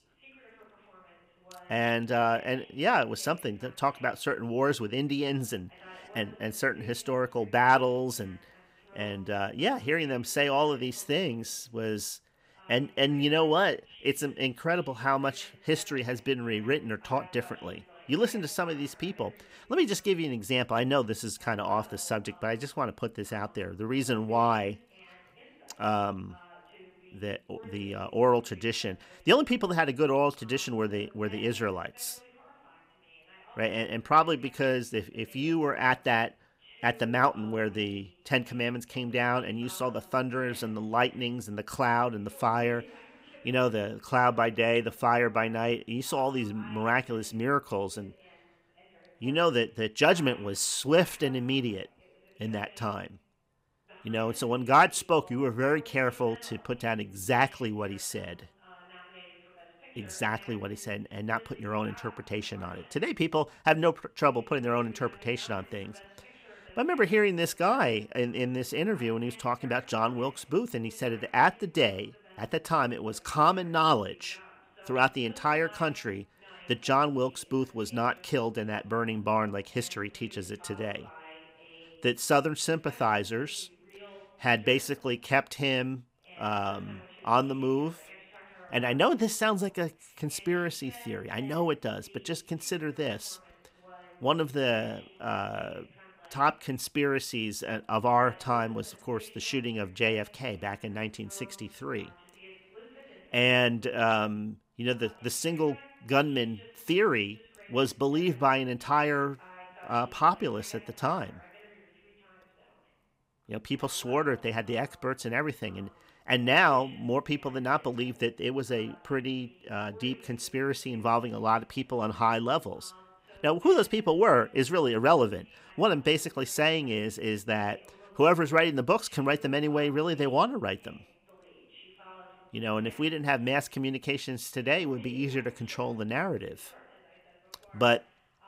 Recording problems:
voice in the background; faint; throughout; 25 dB below the speech

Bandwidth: 15.5 kHz